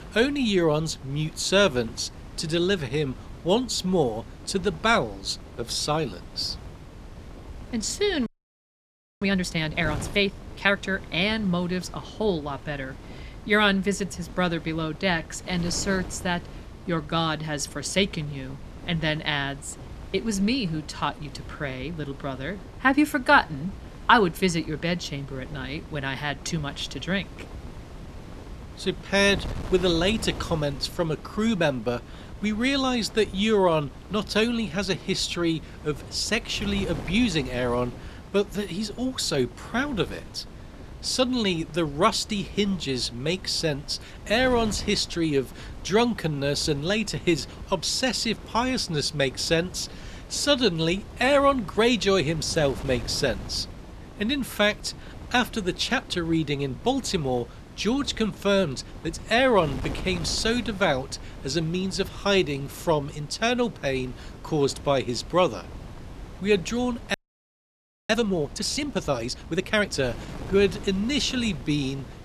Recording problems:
wind noise on the microphone; occasional gusts; 20 dB below the speech
audio freezing; at 8.5 s for 1 s and at 1:07 for 1 s

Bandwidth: 13.5 kHz